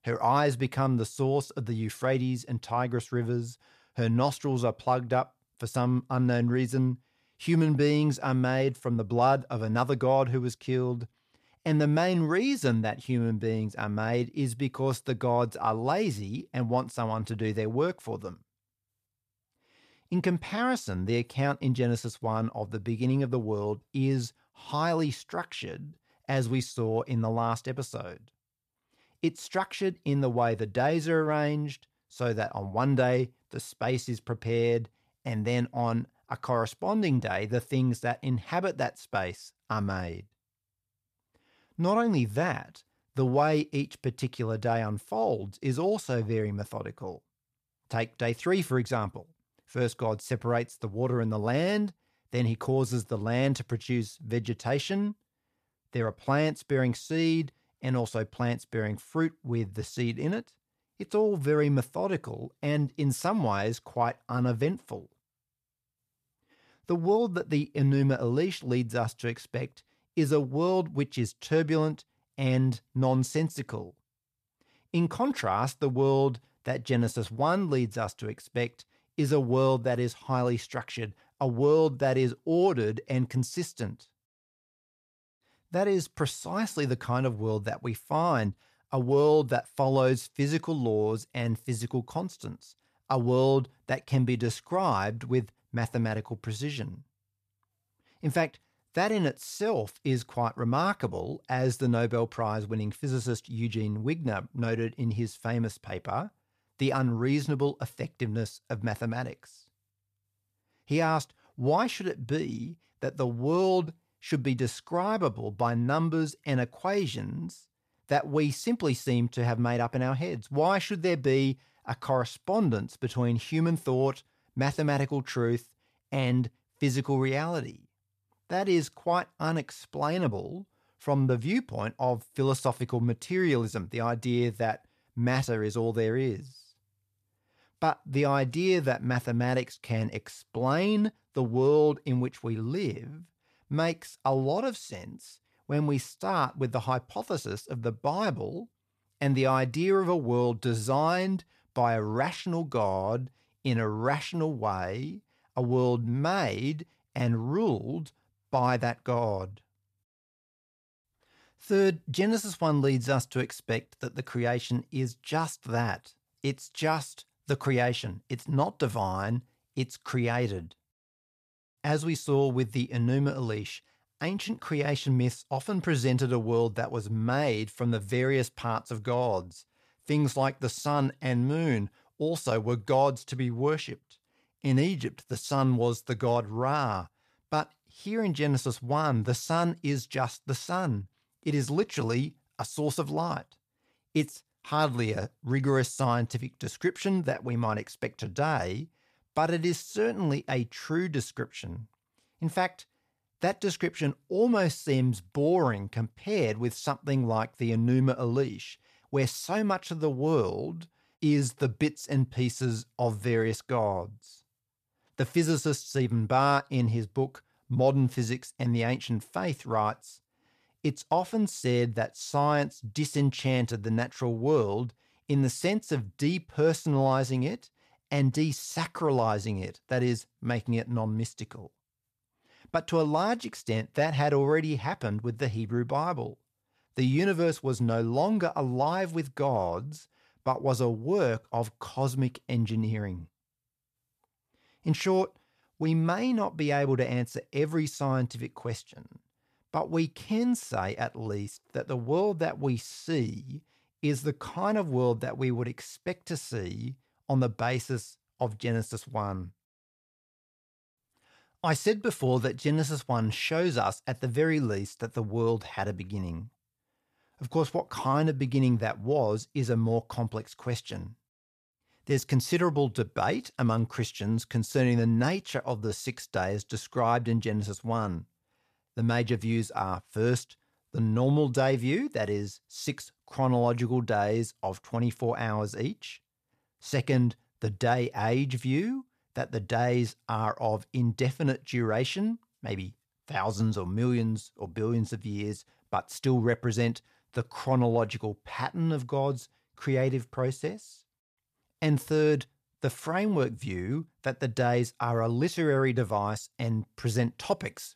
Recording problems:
none

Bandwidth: 14.5 kHz